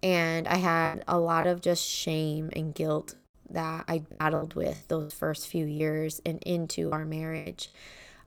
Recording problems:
choppy; very; 8% of the speech affected

